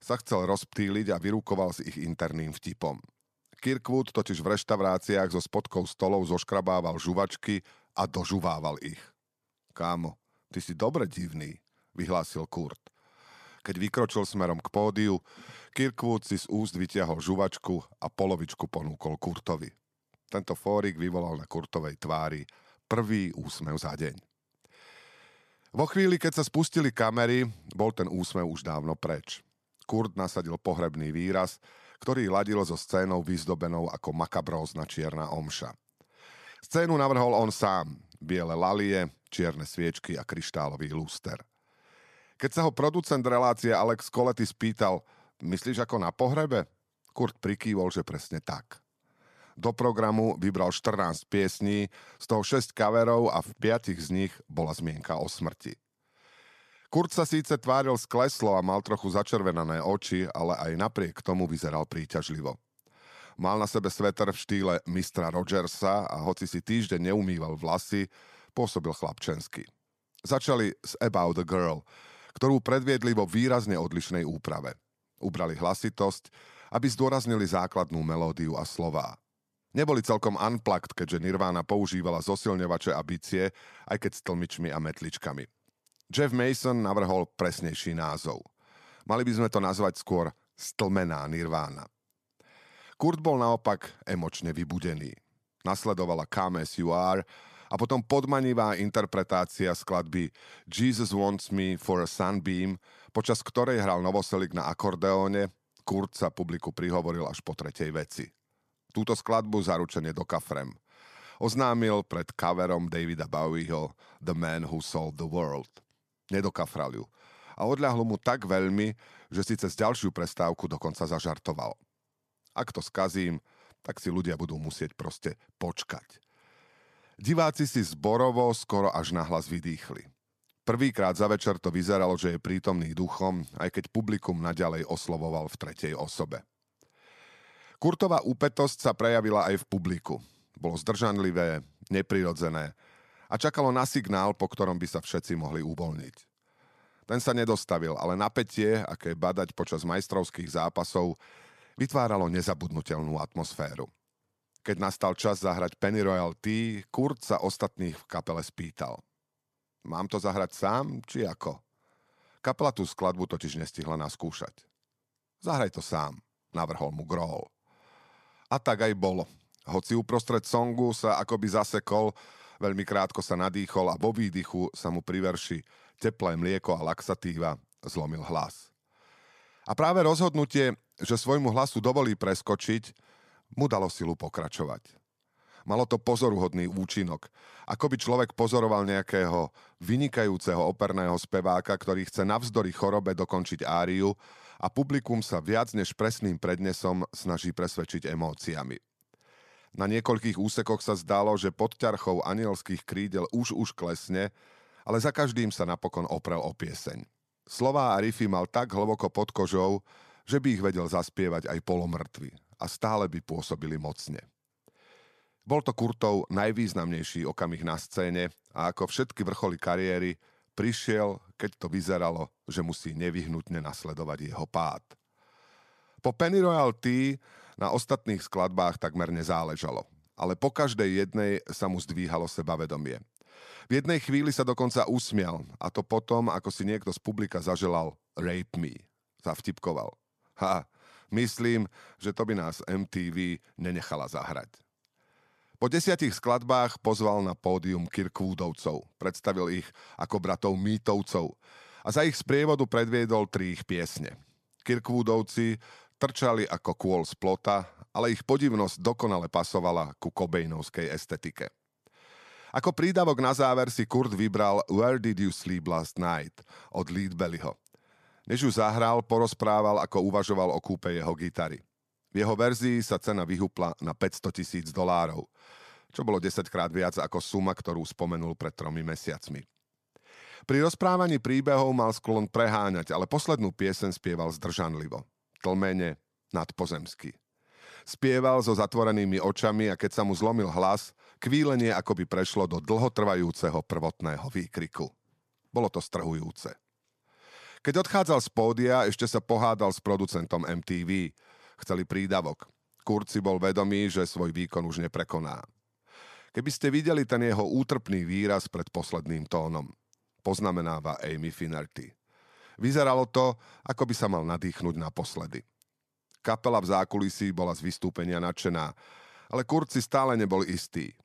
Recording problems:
none

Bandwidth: 14 kHz